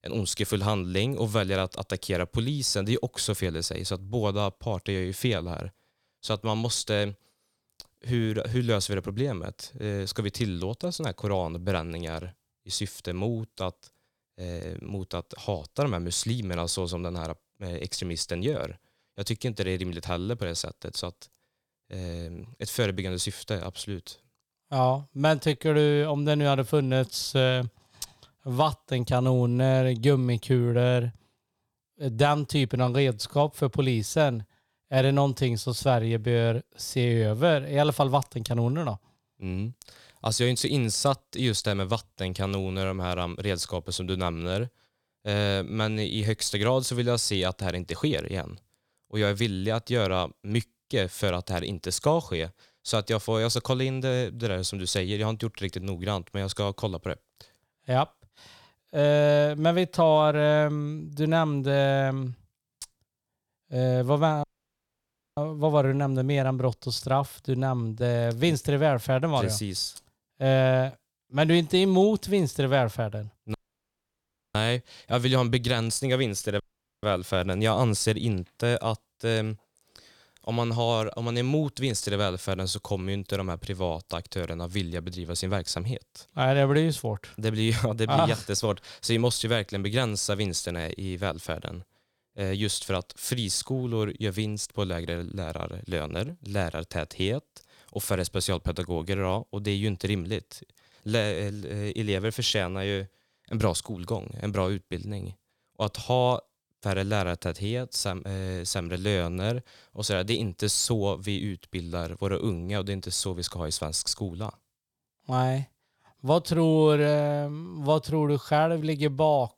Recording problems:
audio cutting out; at 1:04 for 1 s, at 1:14 for 1 s and at 1:17

